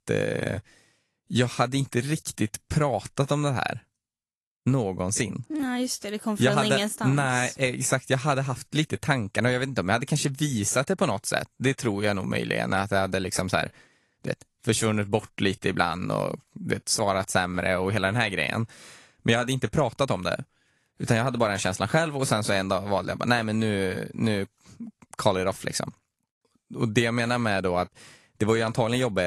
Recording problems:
garbled, watery; slightly; nothing above 11.5 kHz
abrupt cut into speech; at the end

